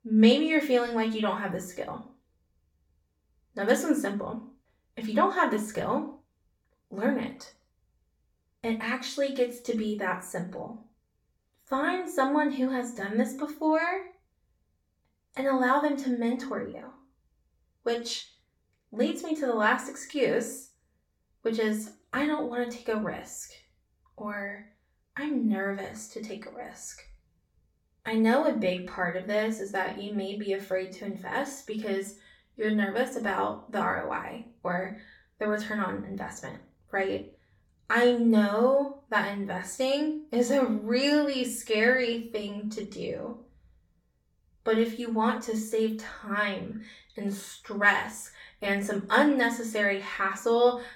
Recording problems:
off-mic speech; far
room echo; slight; dies away in 0.3 s

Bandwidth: 17.5 kHz